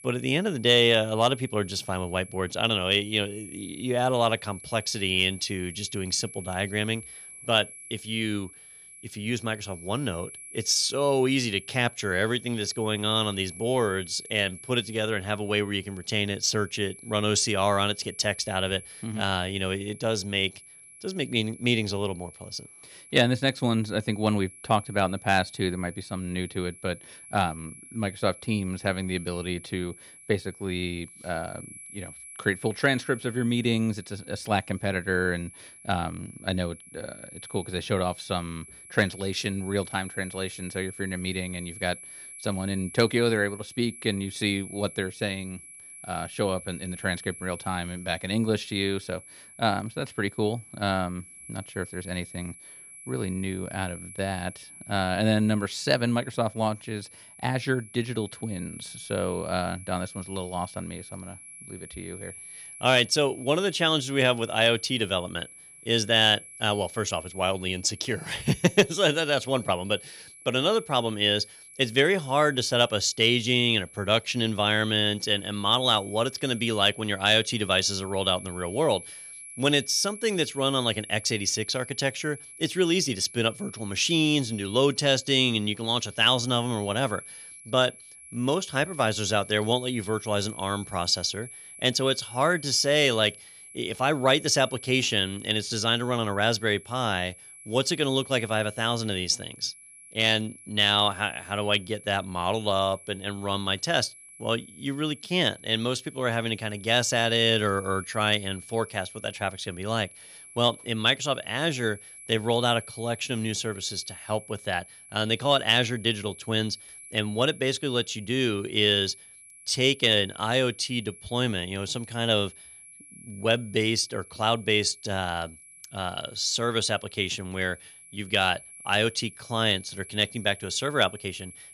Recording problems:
high-pitched whine; noticeable; throughout; 11 kHz, 15 dB below the speech

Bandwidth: 14.5 kHz